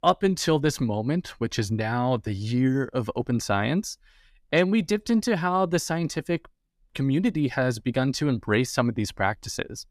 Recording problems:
none

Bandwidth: 14.5 kHz